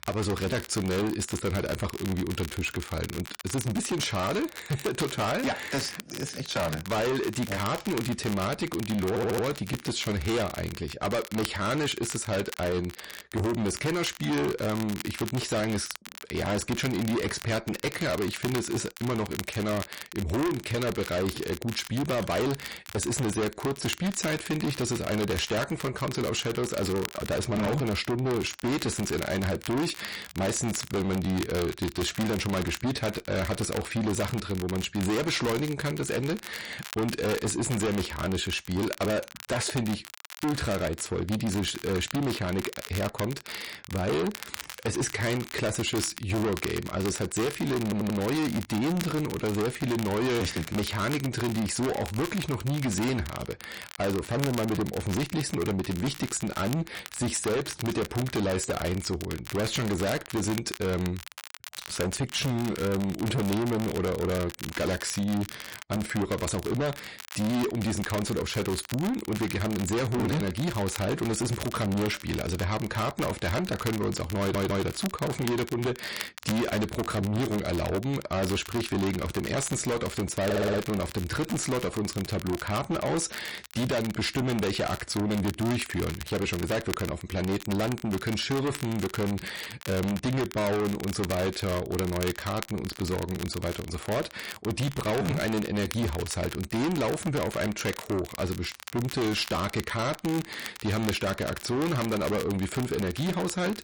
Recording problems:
distortion; heavy; 6 dB below the speech
garbled, watery; slightly; nothing above 10.5 kHz
crackle, like an old record; noticeable; 10 dB below the speech
audio stuttering; 4 times, first at 9 s

